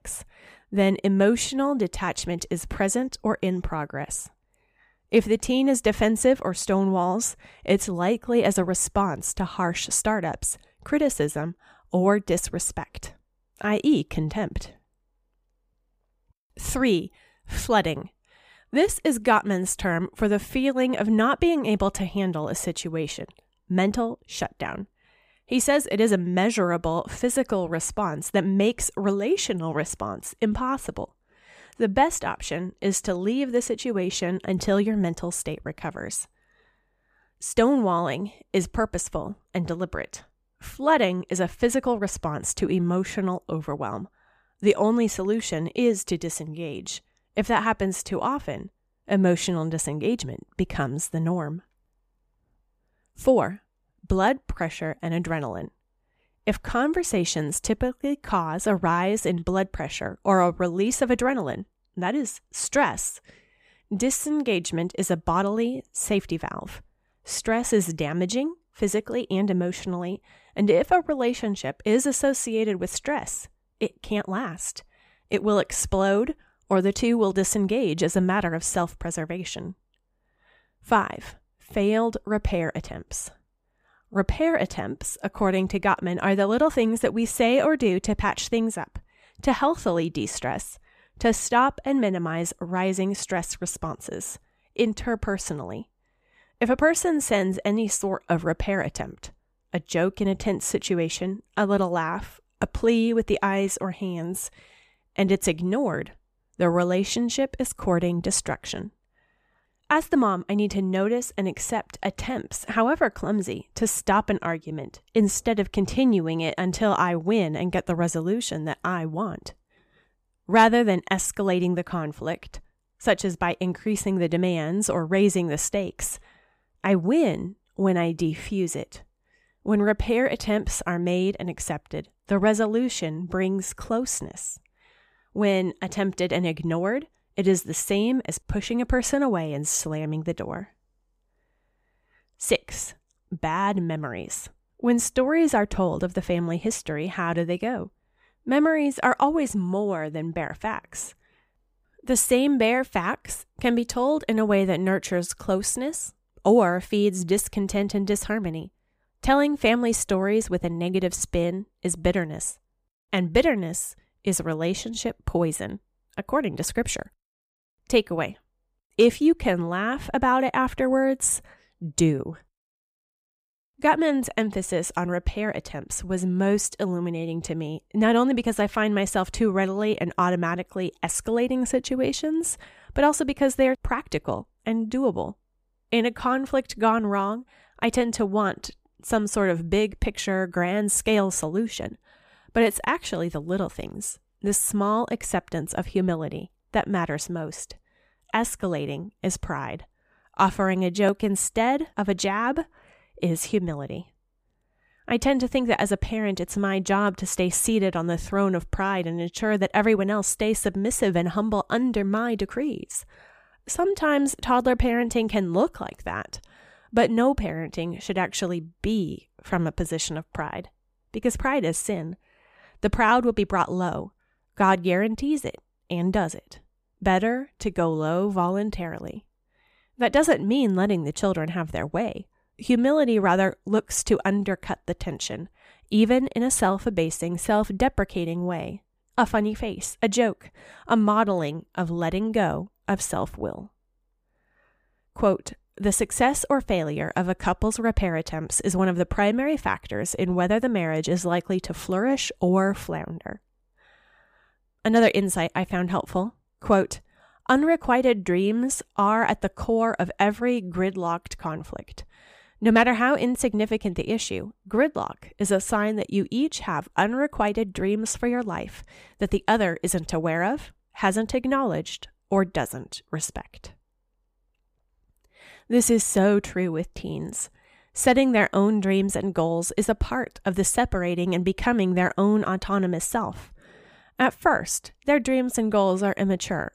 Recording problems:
none

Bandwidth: 15 kHz